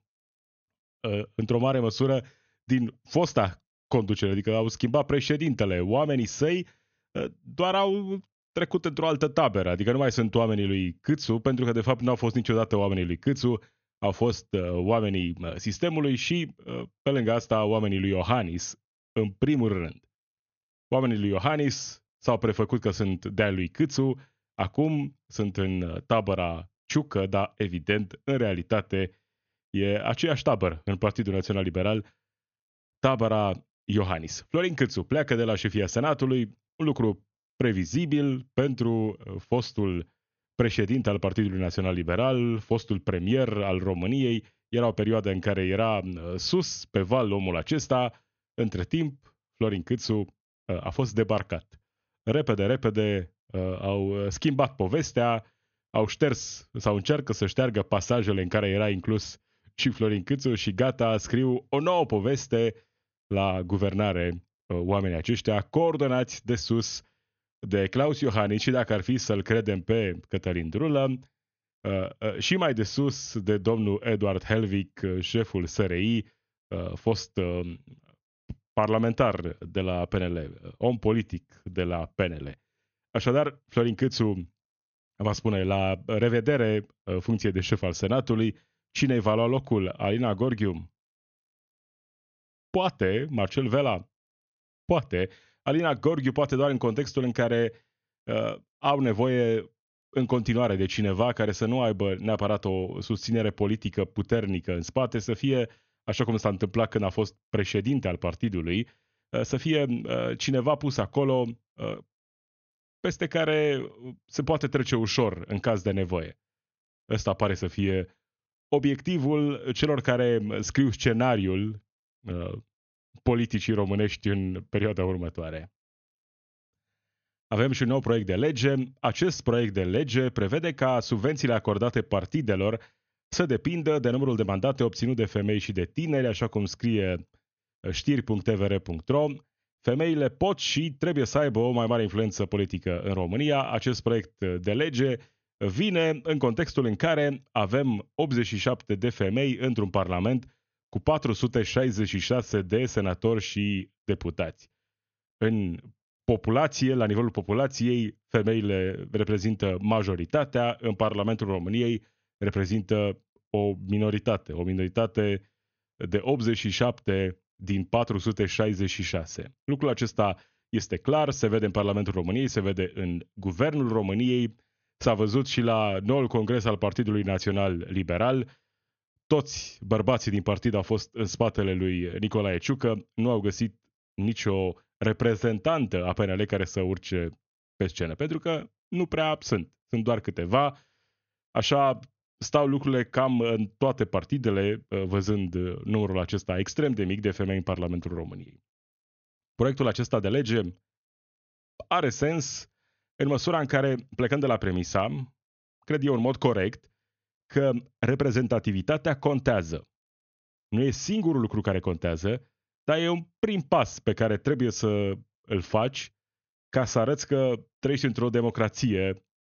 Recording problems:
high frequencies cut off; noticeable; nothing above 6.5 kHz

